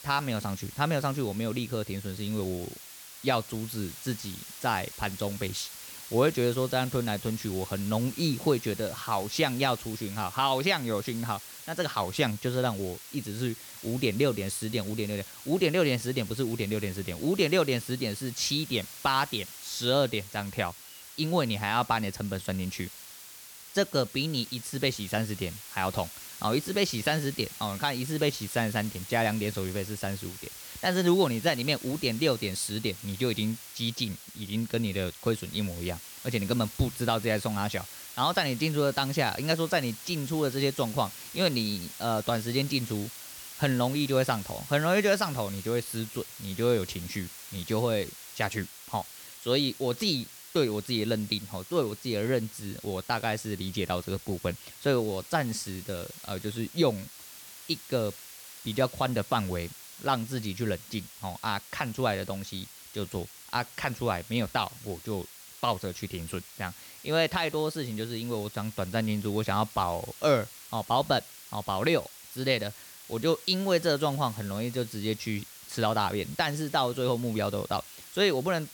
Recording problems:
hiss; noticeable; throughout; 15 dB below the speech

